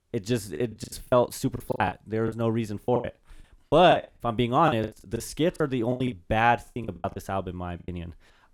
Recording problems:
choppy; very; 17% of the speech affected

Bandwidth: 19 kHz